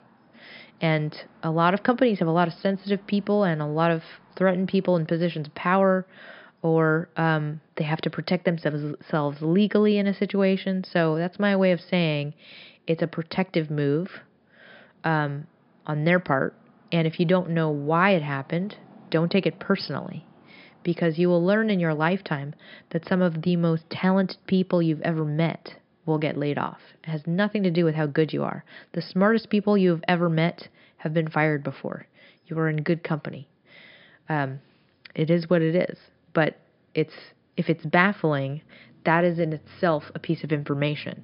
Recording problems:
high frequencies cut off; noticeable; nothing above 5.5 kHz

